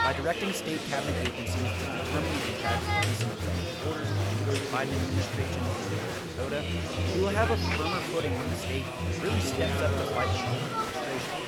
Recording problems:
chatter from many people; very loud; throughout; 5 dB above the speech

